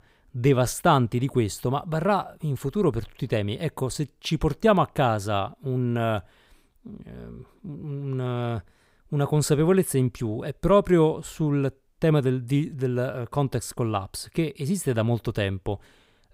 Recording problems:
none

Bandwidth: 15.5 kHz